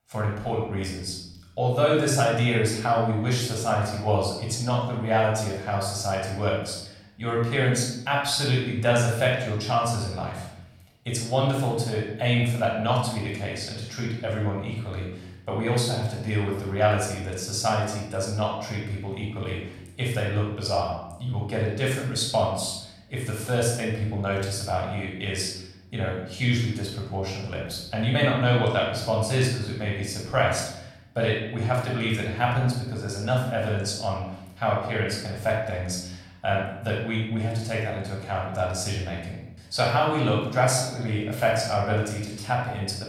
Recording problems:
off-mic speech; far
room echo; noticeable; dies away in 0.8 s

